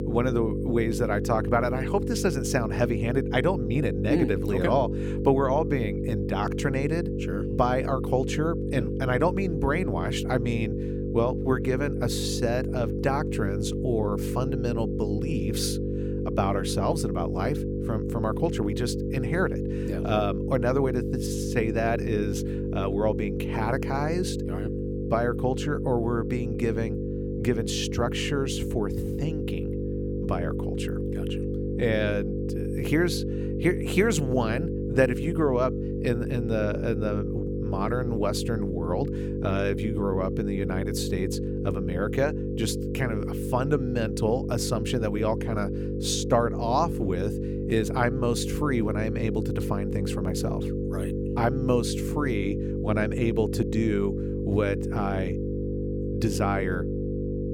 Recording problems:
electrical hum; loud; throughout; 50 Hz, 5 dB below the speech

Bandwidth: 17.5 kHz